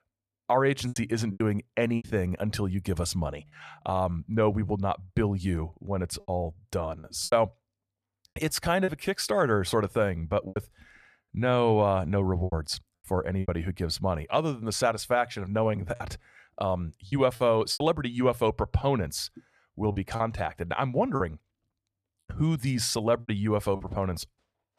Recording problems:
choppy; very; 6% of the speech affected

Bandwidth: 14.5 kHz